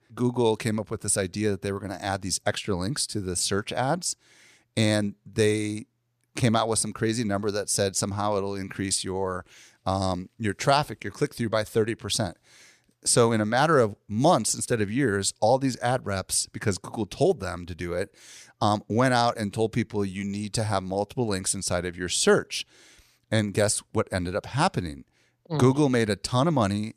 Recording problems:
none

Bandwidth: 14.5 kHz